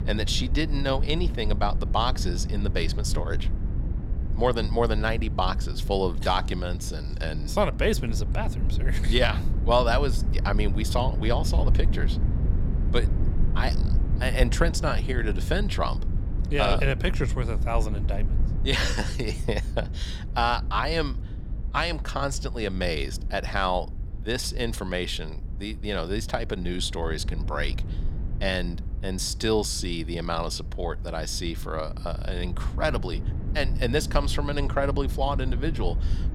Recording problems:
low rumble; noticeable; throughout; 15 dB below the speech

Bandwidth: 19 kHz